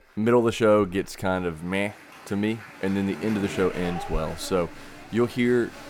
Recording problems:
crowd noise; noticeable; throughout; 15 dB below the speech

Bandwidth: 17.5 kHz